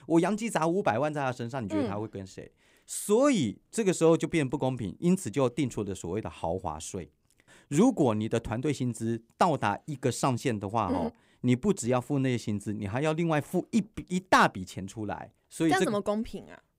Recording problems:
none

